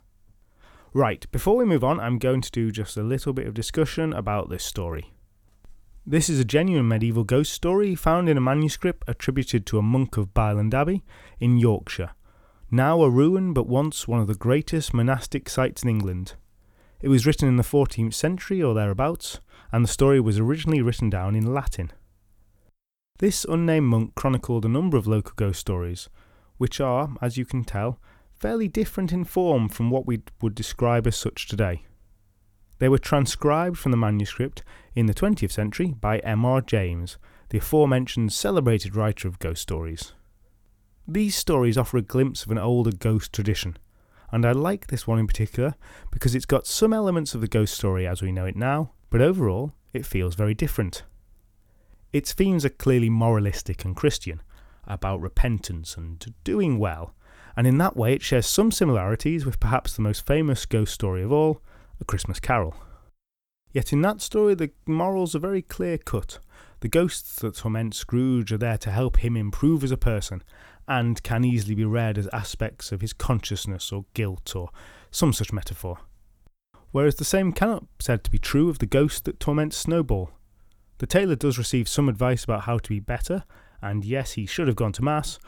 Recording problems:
none

